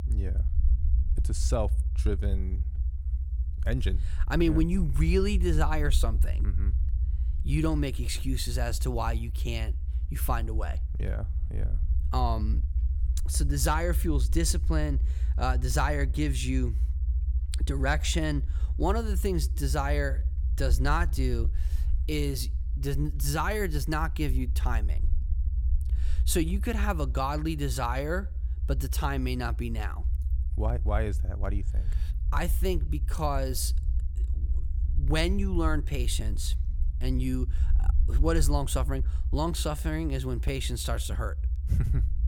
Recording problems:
low rumble; noticeable; throughout; 15 dB below the speech

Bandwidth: 17 kHz